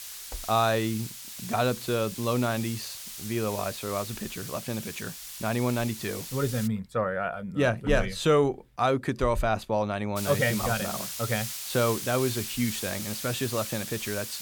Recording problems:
hiss; loud; until 6.5 s and from 10 s on; 7 dB below the speech

